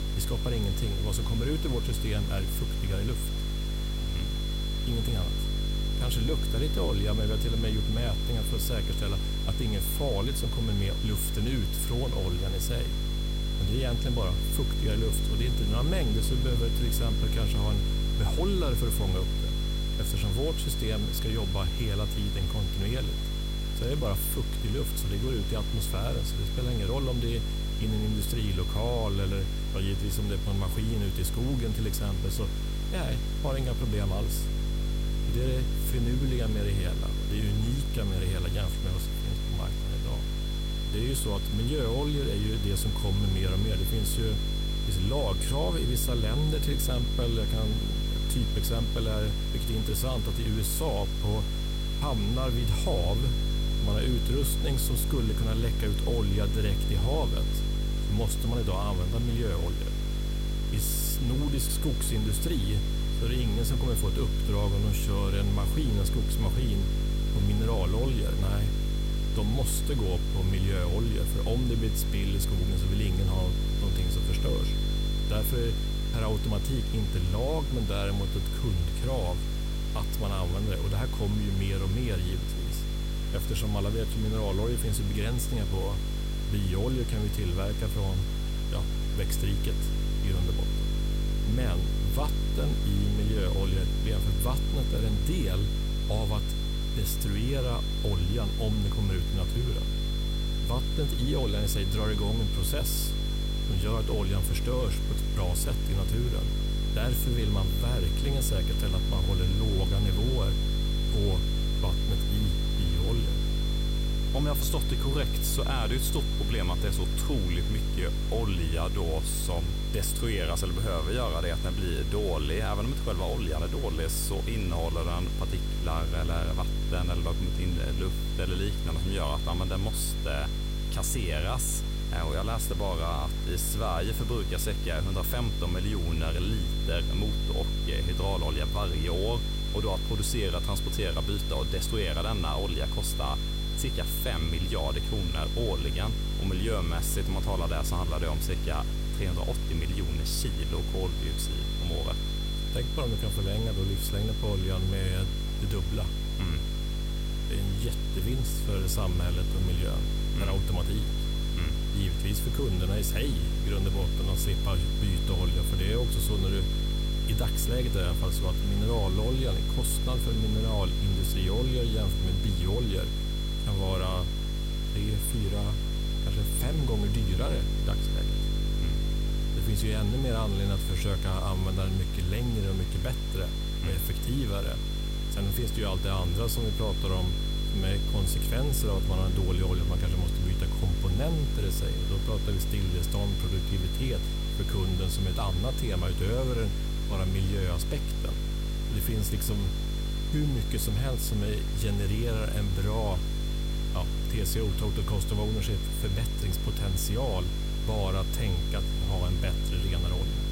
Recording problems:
electrical hum; loud; throughout; 50 Hz, 8 dB below the speech
high-pitched whine; loud; throughout; 3.5 kHz, 8 dB below the speech
hiss; noticeable; throughout; 15 dB below the speech

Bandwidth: 16 kHz